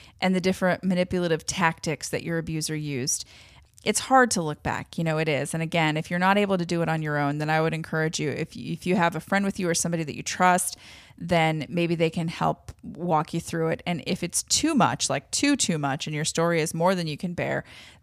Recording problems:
none

